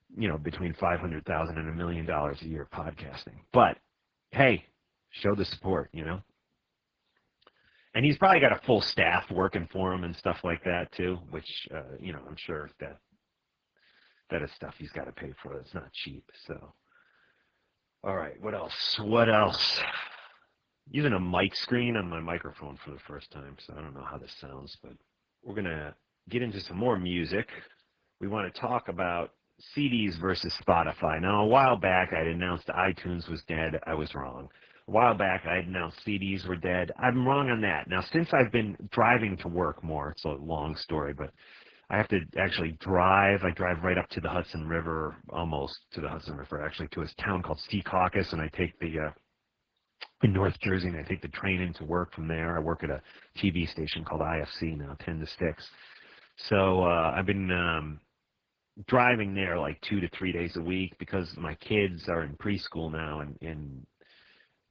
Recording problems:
garbled, watery; badly

